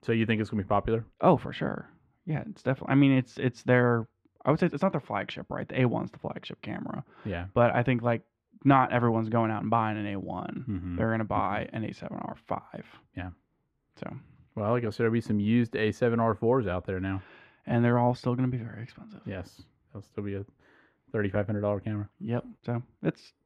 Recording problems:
muffled; very; fading above 3.5 kHz

